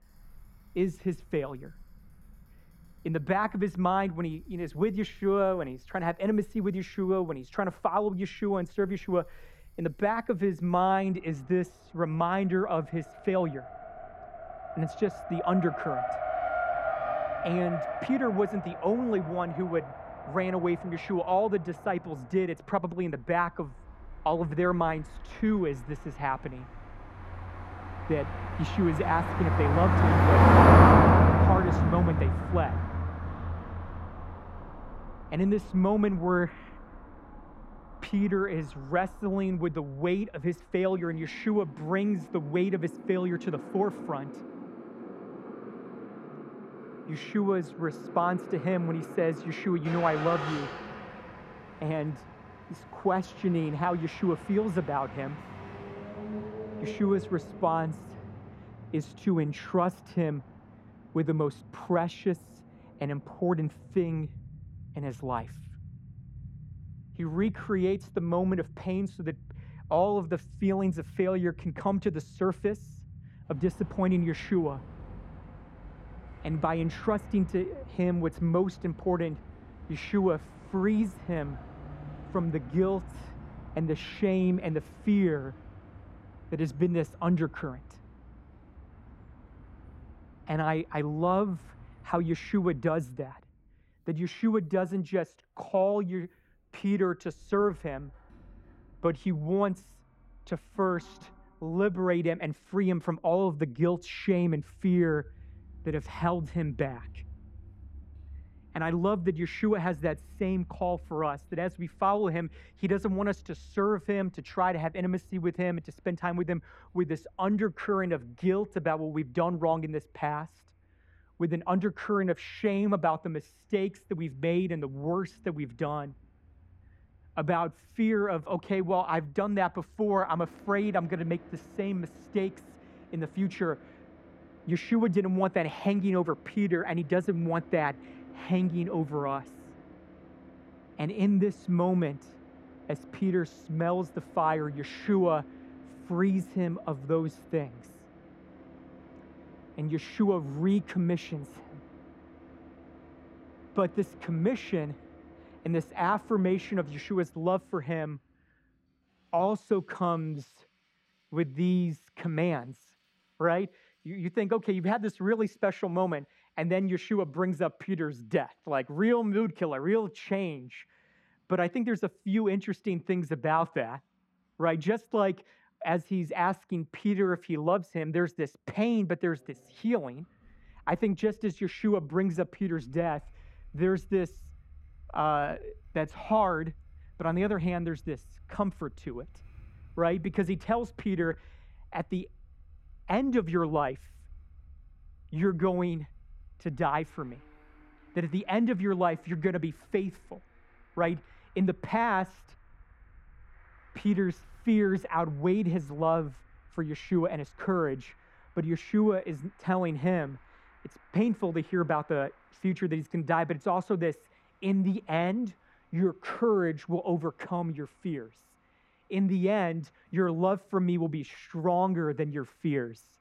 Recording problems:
muffled; slightly; fading above 3 kHz
traffic noise; loud; throughout; 1 dB below the speech

